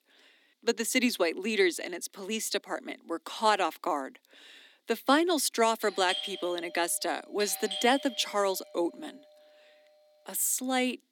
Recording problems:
thin; somewhat; fading below 300 Hz
doorbell; noticeable; from 6 to 8.5 s; peak 5 dB below the speech

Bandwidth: 17.5 kHz